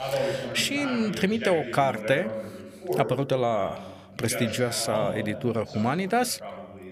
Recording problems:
voice in the background; loud; throughout; 7 dB below the speech

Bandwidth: 15 kHz